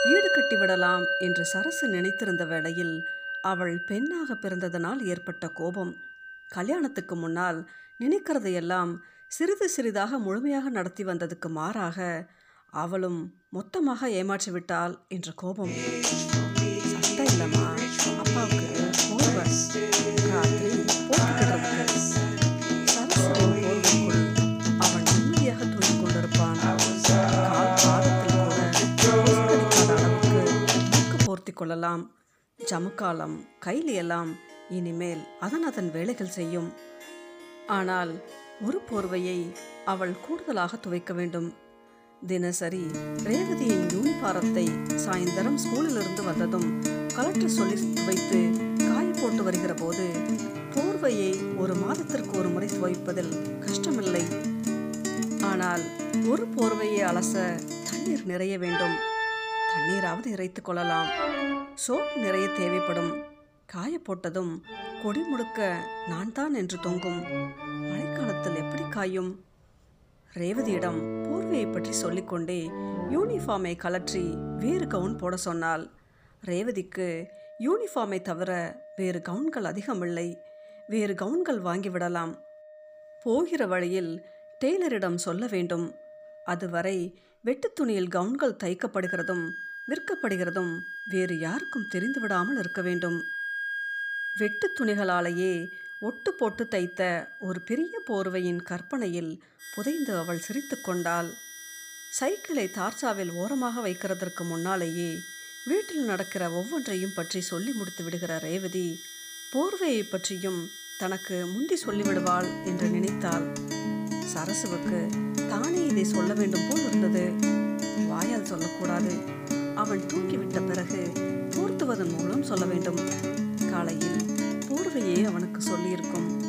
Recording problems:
background music; very loud; throughout; 3 dB above the speech

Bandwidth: 15 kHz